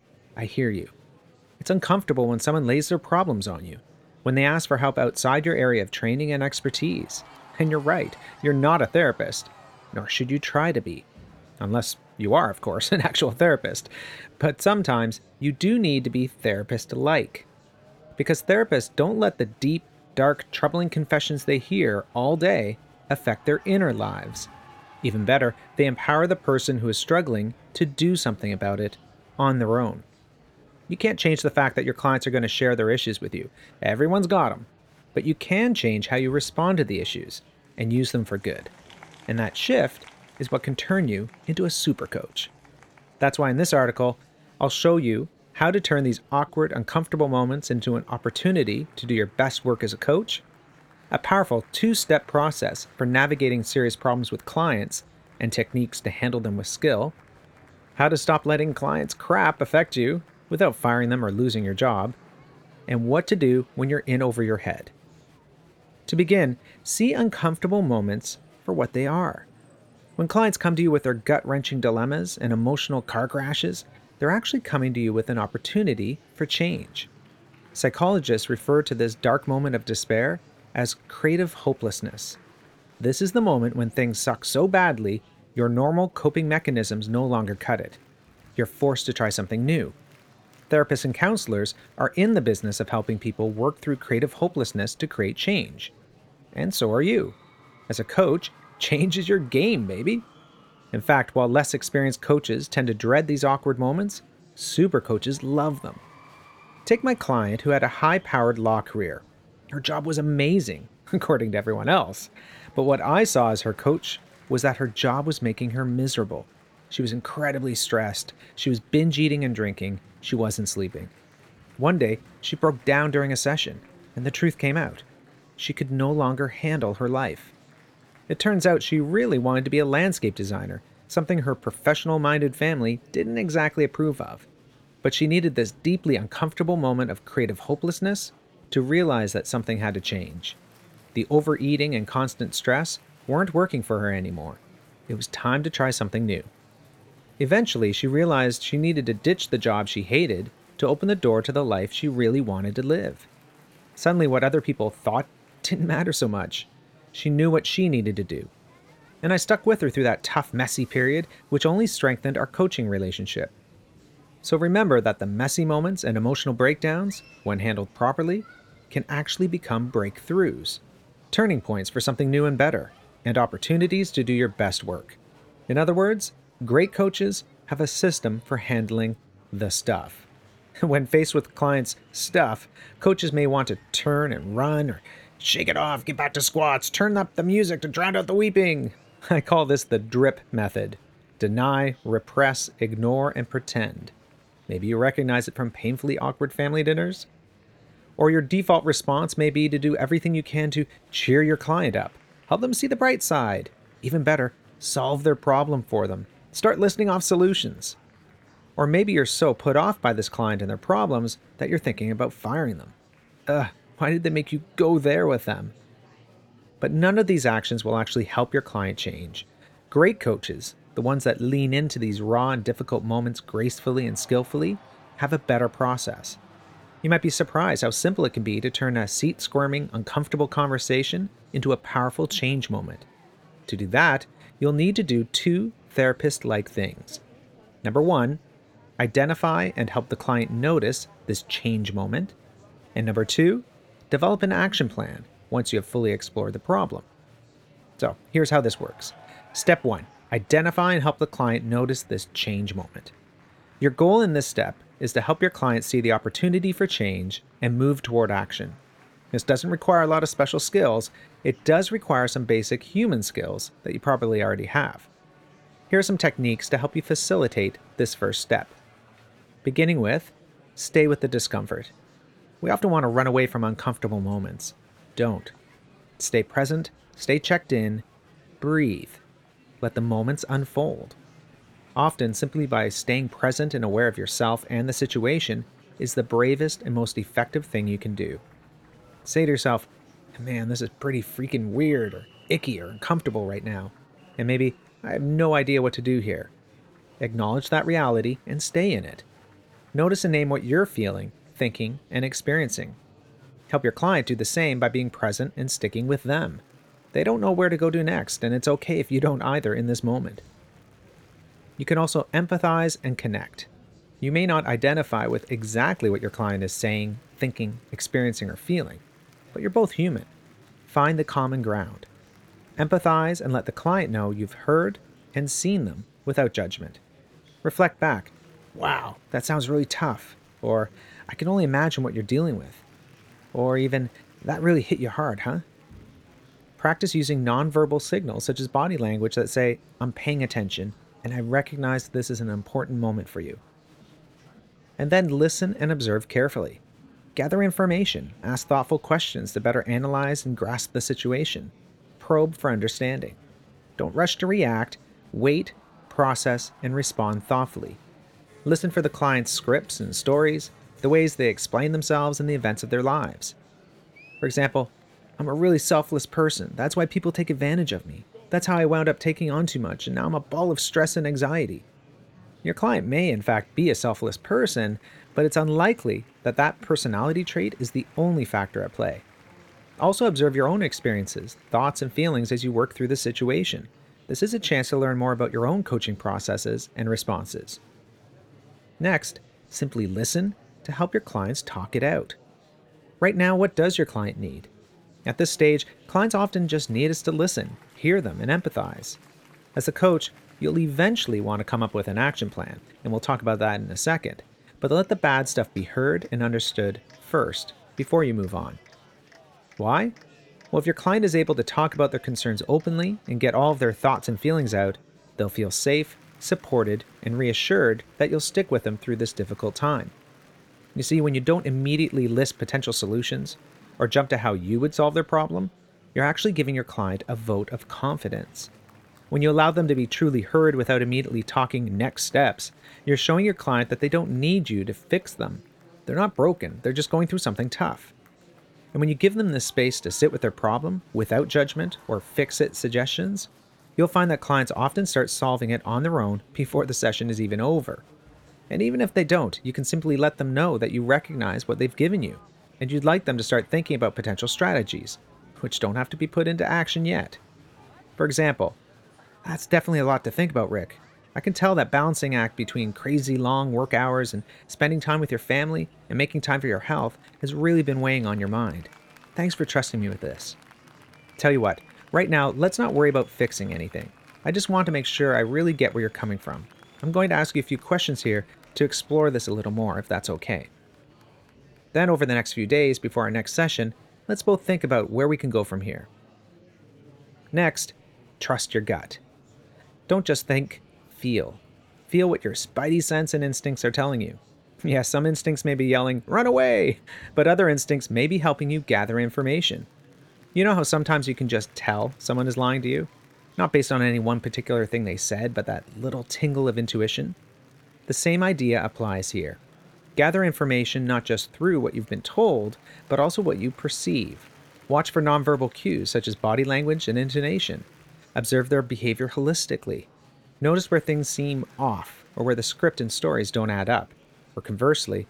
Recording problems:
murmuring crowd; faint; throughout; 30 dB below the speech

